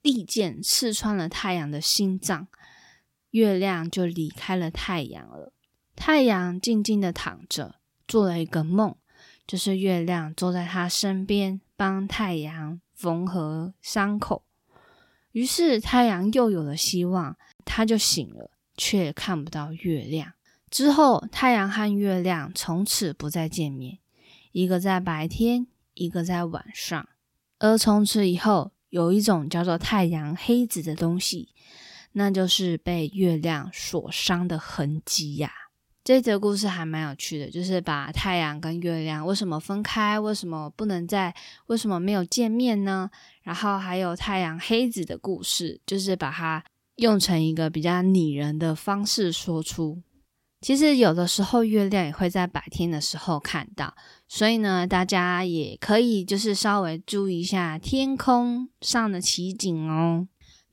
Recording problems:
none

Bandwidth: 16.5 kHz